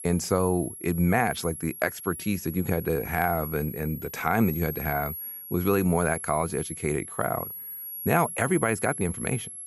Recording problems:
high-pitched whine; loud; throughout; 11 kHz, 8 dB below the speech

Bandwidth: 14.5 kHz